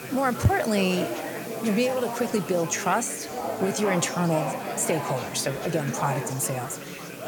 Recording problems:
chatter from many people; loud; throughout; 7 dB below the speech
hiss; noticeable; throughout; 15 dB below the speech

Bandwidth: 18 kHz